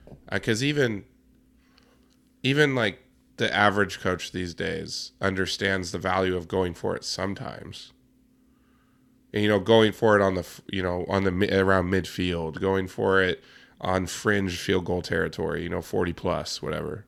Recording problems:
none

